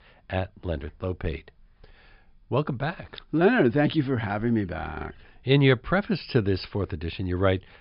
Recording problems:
high frequencies cut off; noticeable; nothing above 5.5 kHz

